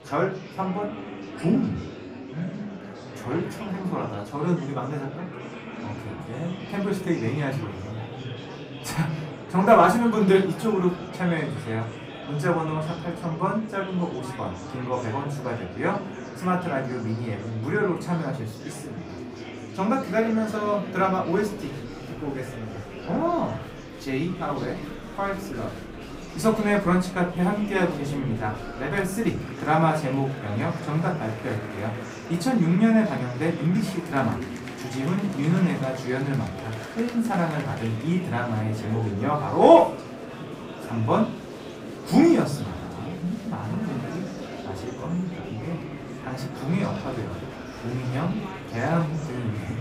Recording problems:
off-mic speech; far
room echo; very slight; dies away in 0.3 s
murmuring crowd; noticeable; throughout; 10 dB below the speech

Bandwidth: 15.5 kHz